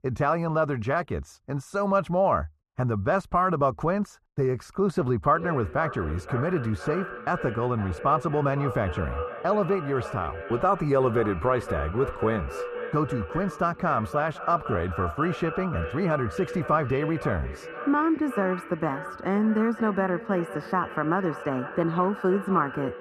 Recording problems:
echo of what is said; strong; from 5.5 s on; 510 ms later, 10 dB below the speech
muffled; very; fading above 2.5 kHz

